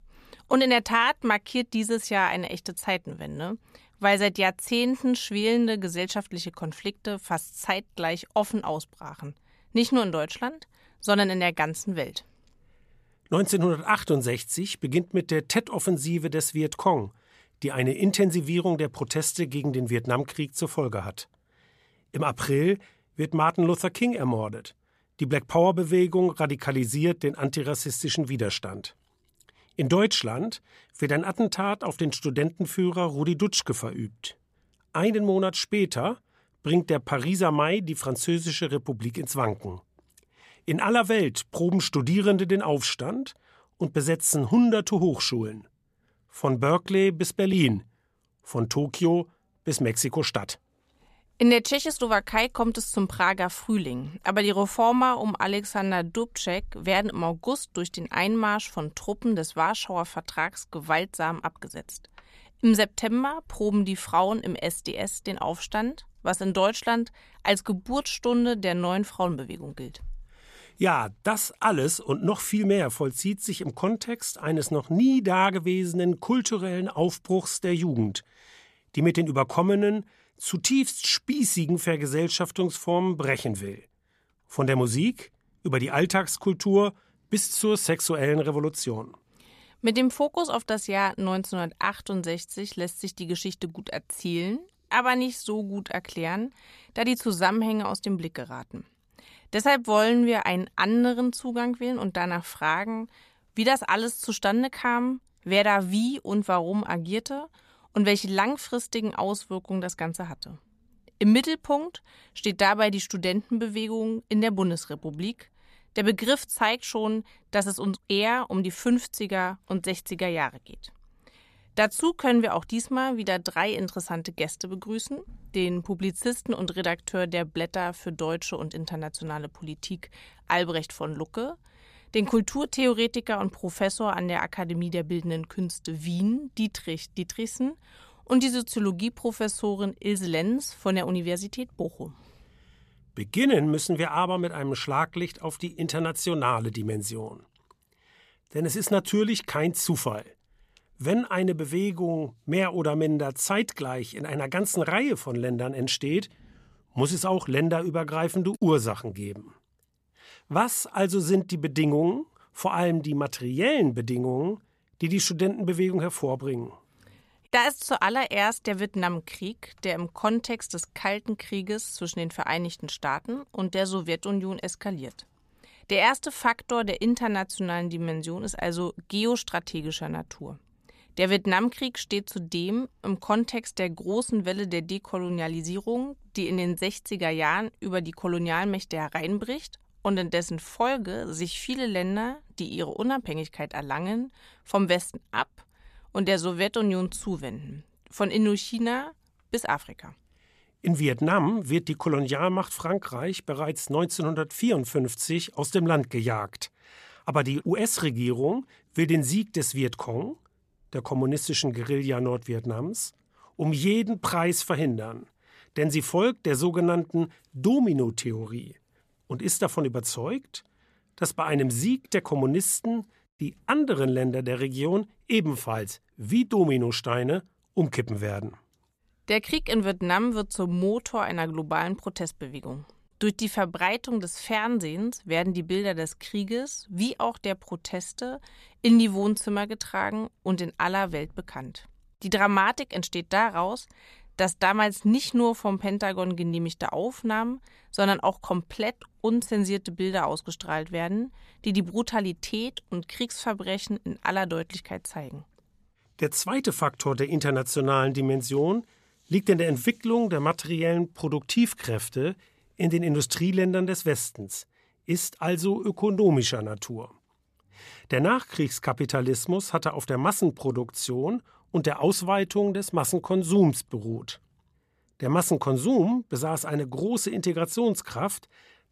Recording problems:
none

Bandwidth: 14.5 kHz